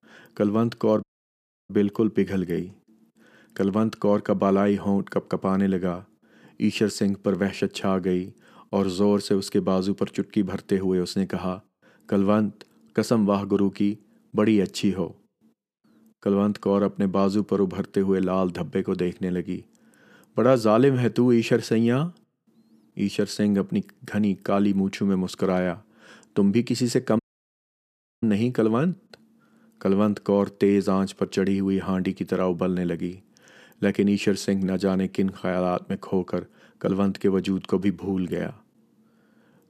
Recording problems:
audio cutting out; at 1 s for 0.5 s and at 27 s for 1 s

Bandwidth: 14.5 kHz